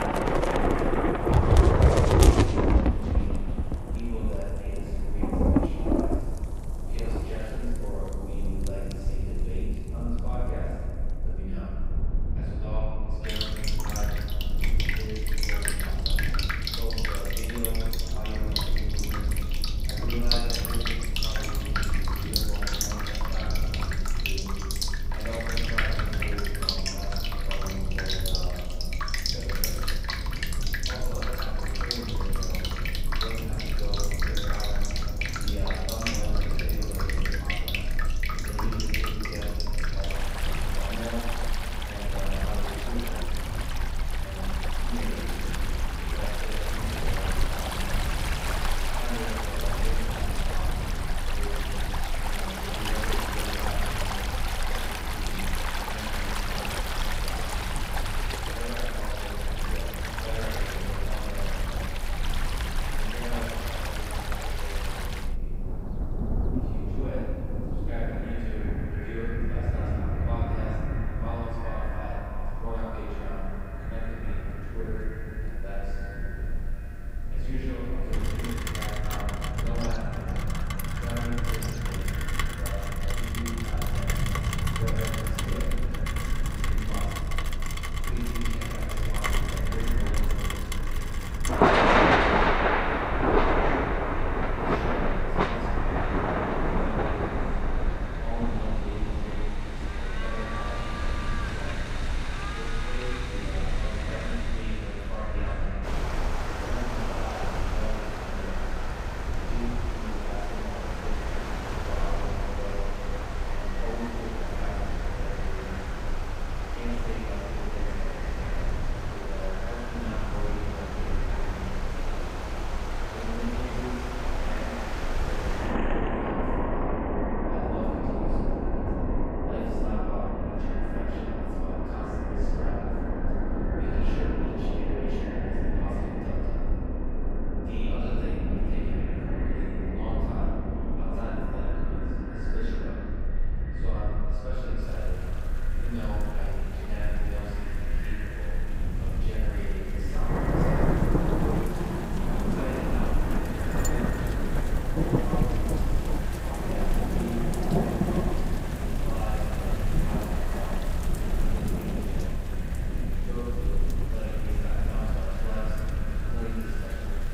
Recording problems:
echo of what is said; strong; from 1:08 on; 330 ms later, 7 dB below the speech
room echo; strong; dies away in 2.1 s
off-mic speech; far
rain or running water; very loud; throughout; 8 dB above the speech
low rumble; loud; throughout; 7 dB below the speech

